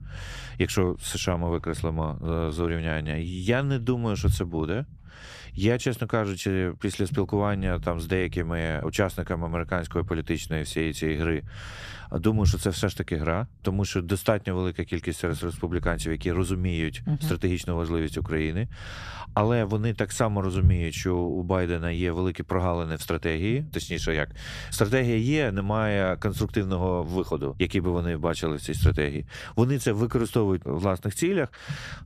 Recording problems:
low rumble; faint; throughout; 20 dB below the speech

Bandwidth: 14.5 kHz